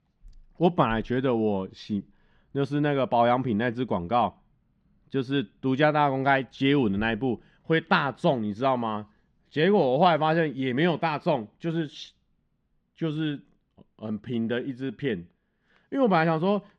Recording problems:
muffled; very slightly; fading above 3.5 kHz

